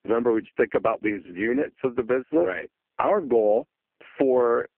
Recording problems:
phone-call audio; poor line

